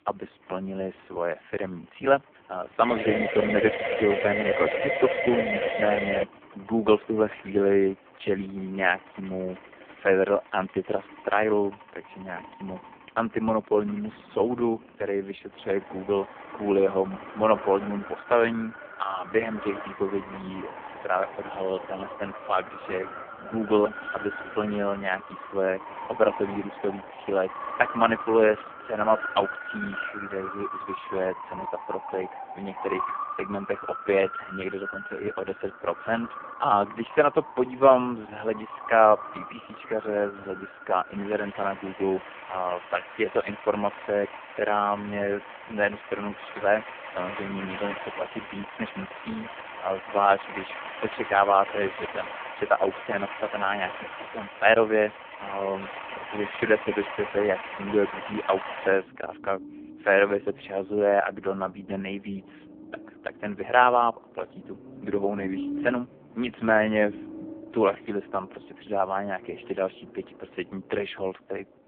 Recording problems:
phone-call audio; poor line
traffic noise; noticeable; throughout; 10 dB below the speech
siren; loud; from 3 to 6 s; peak 1 dB above the speech

